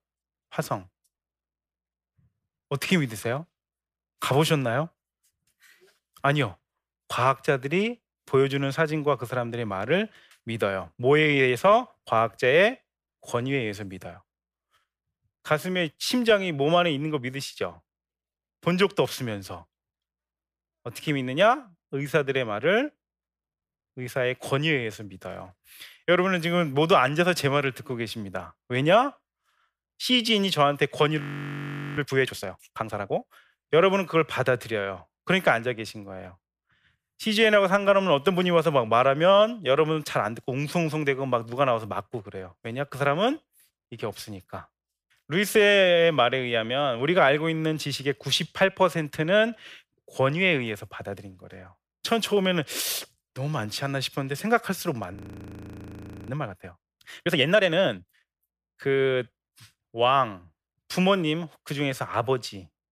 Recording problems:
audio freezing; at 31 s for 1 s and at 55 s for 1 s

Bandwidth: 15 kHz